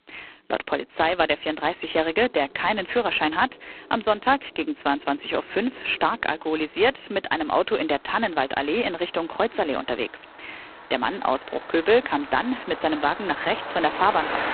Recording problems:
phone-call audio; poor line; nothing above 4 kHz
traffic noise; noticeable; throughout; 15 dB below the speech

